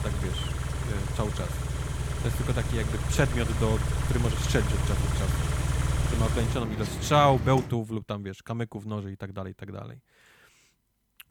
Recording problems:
traffic noise; very loud; until 7.5 s; as loud as the speech

